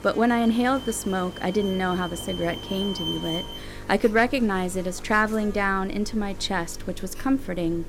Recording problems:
electrical hum; noticeable; throughout; 50 Hz, 20 dB below the speech
alarms or sirens; noticeable; throughout; 10 dB below the speech

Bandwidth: 16.5 kHz